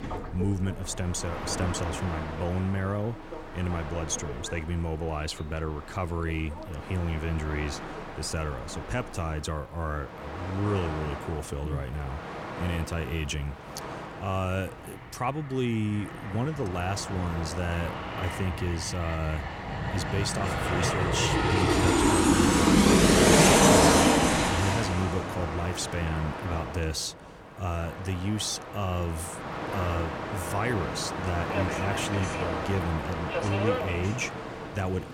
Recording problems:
train or aircraft noise; very loud; throughout; 5 dB above the speech

